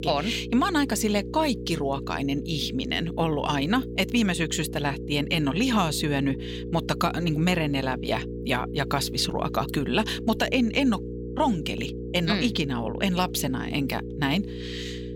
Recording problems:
electrical hum; noticeable; throughout; 60 Hz, 10 dB below the speech

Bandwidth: 16.5 kHz